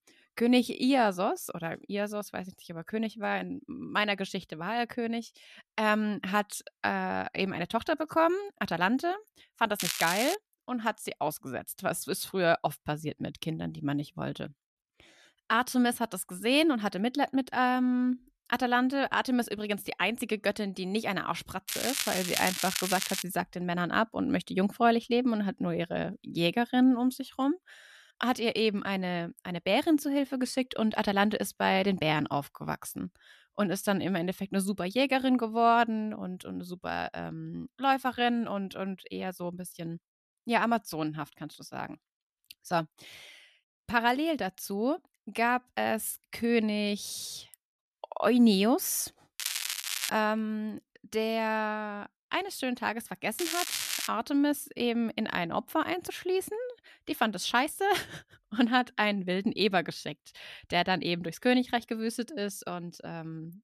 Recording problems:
crackling; loud; 4 times, first at 10 s; 2 dB below the speech

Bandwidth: 13.5 kHz